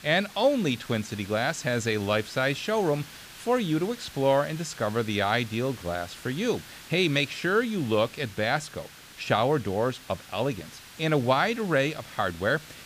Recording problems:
hiss; noticeable; throughout; 15 dB below the speech

